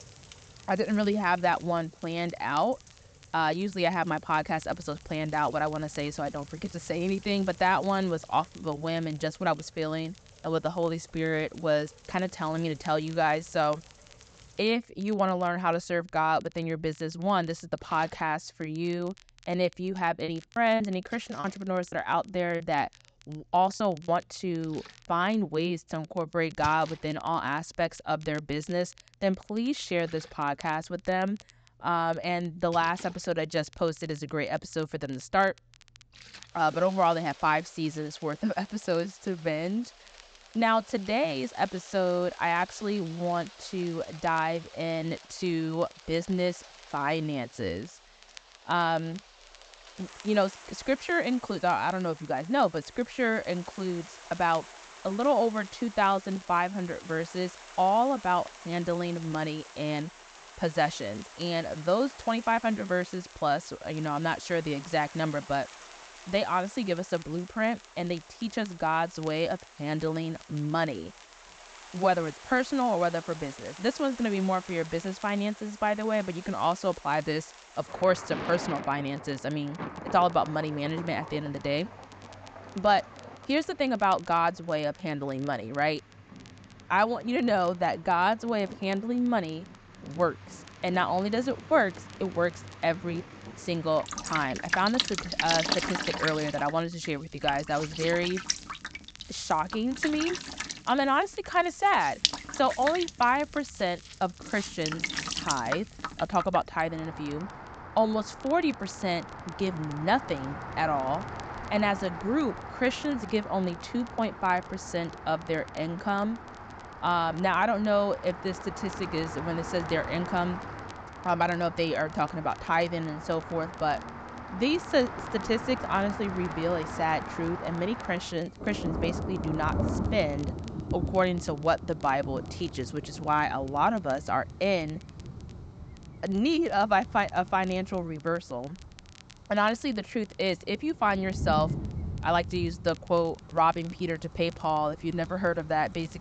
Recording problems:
high frequencies cut off; noticeable; nothing above 8 kHz
rain or running water; noticeable; throughout; 10 dB below the speech
crackle, like an old record; faint; 25 dB below the speech
choppy; very; from 20 to 24 s; 7% of the speech affected

